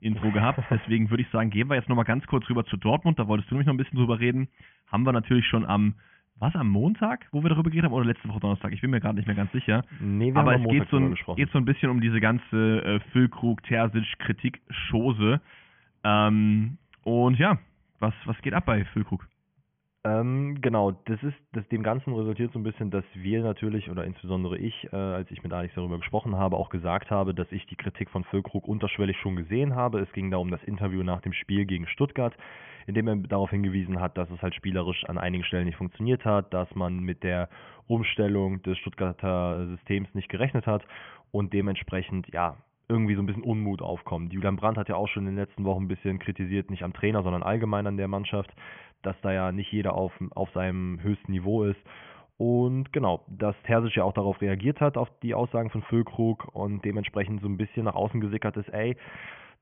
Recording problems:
high frequencies cut off; severe; nothing above 3.5 kHz

